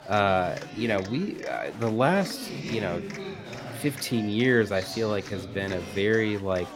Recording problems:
chatter from many people; noticeable; throughout; 10 dB below the speech

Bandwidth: 16 kHz